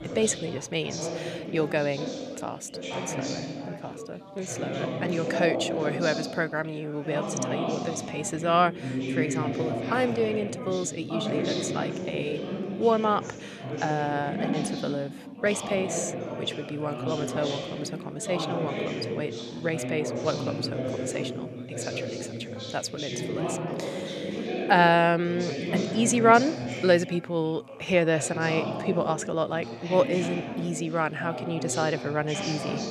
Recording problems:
background chatter; loud; throughout; 3 voices, 5 dB below the speech

